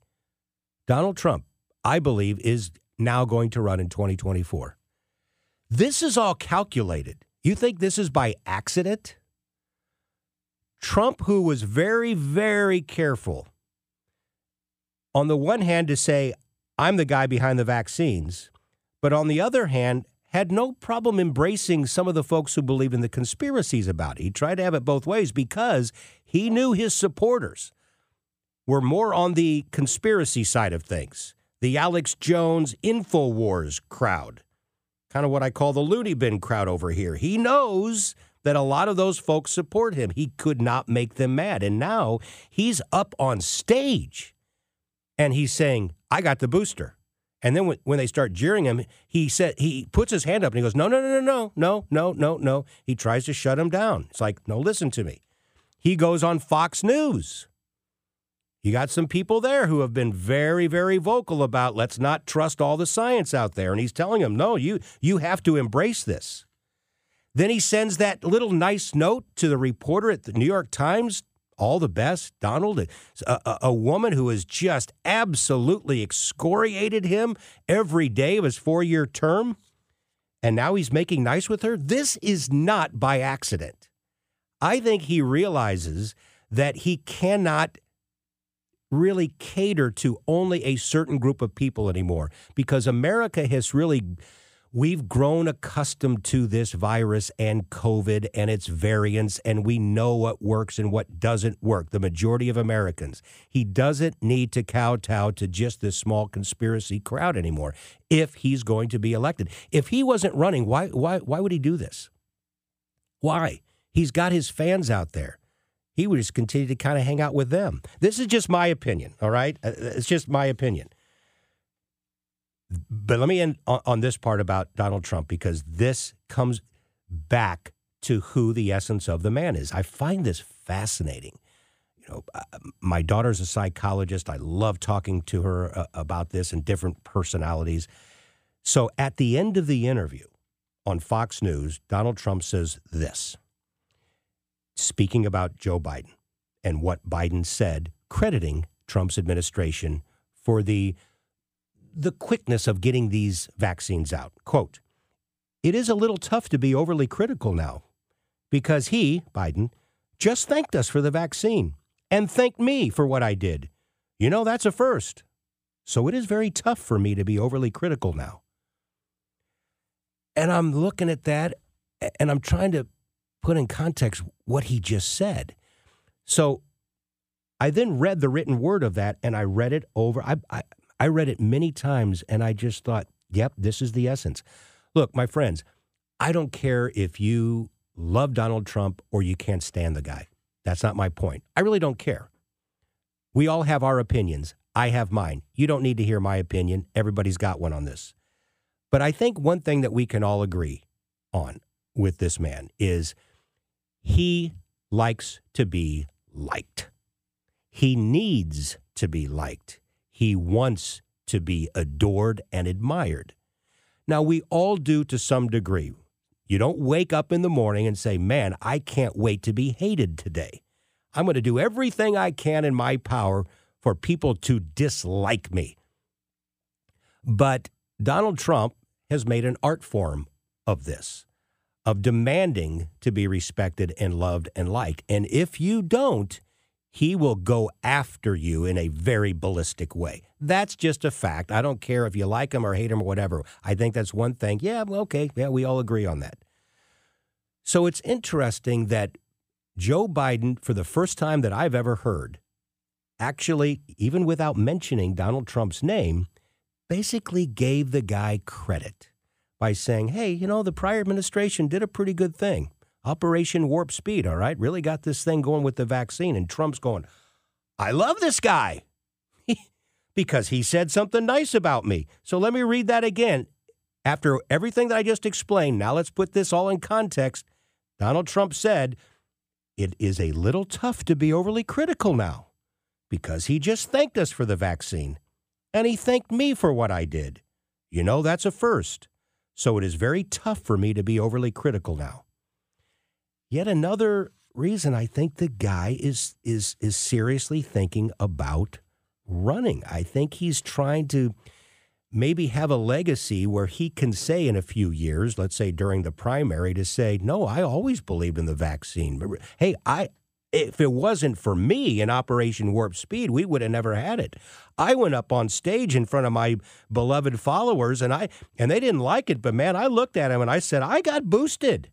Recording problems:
none

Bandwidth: 15 kHz